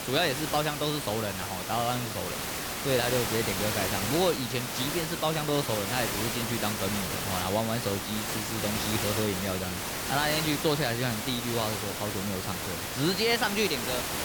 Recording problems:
hiss; loud; throughout; 1 dB below the speech

